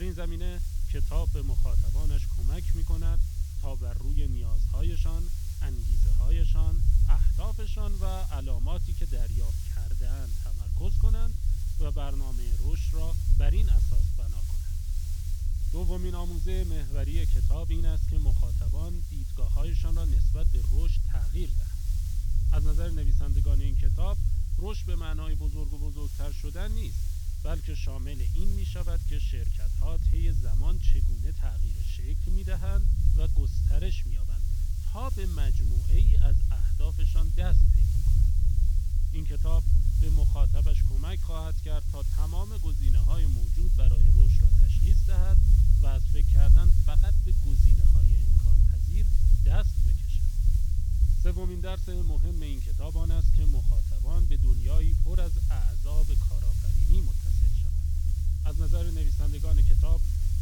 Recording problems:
high frequencies cut off; noticeable; nothing above 6 kHz
hiss; loud; throughout; 6 dB below the speech
low rumble; loud; throughout; 2 dB below the speech
abrupt cut into speech; at the start

